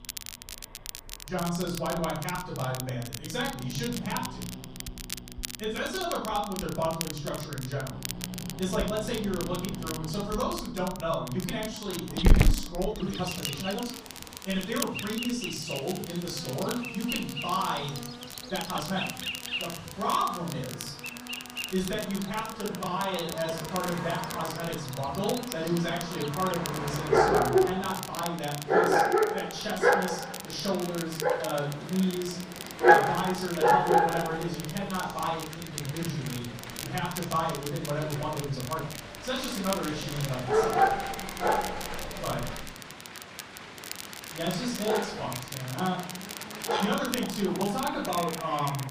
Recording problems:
off-mic speech; far
room echo; noticeable; dies away in 0.6 s
animal sounds; very loud; throughout; 2 dB above the speech
crackle, like an old record; loud; 8 dB below the speech
traffic noise; noticeable; throughout; 15 dB below the speech
uneven, jittery; strongly; from 8.5 to 39 s

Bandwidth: 15 kHz